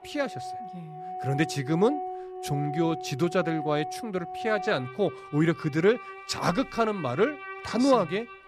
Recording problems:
background music; noticeable; throughout; 10 dB below the speech

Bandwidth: 14.5 kHz